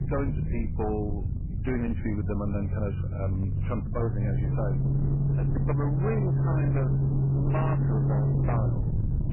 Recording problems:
garbled, watery; badly; nothing above 2.5 kHz
distortion; slight; 22% of the sound clipped
low rumble; loud; throughout; 3 dB below the speech
voice in the background; faint; throughout; 25 dB below the speech
footsteps; noticeable; at 5.5 s; peak 6 dB below the speech
jangling keys; very faint; at 8.5 s; peak 30 dB below the speech

